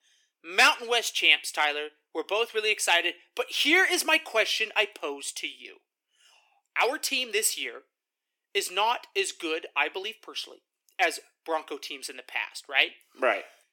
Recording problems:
thin; somewhat; fading below 300 Hz

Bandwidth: 17 kHz